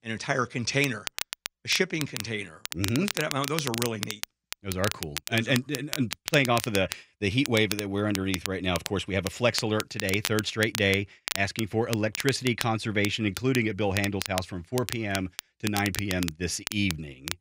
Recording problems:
crackle, like an old record; loud; 8 dB below the speech

